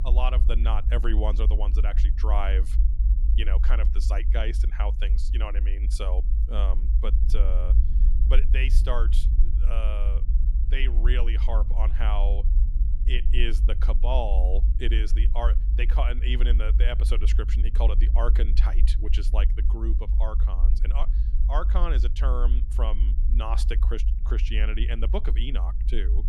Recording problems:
low rumble; noticeable; throughout; 10 dB below the speech

